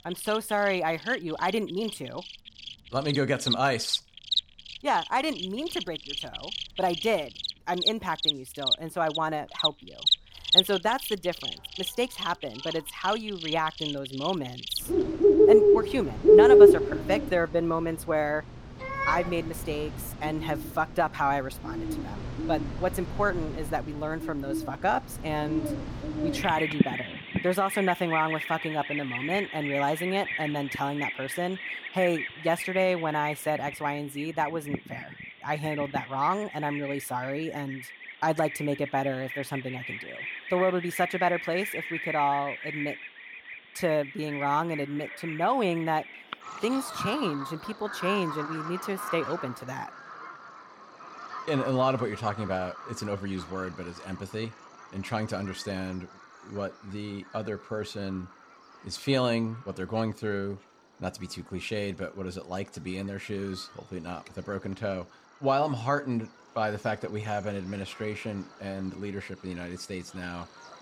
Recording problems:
animal sounds; very loud; throughout; 2 dB above the speech

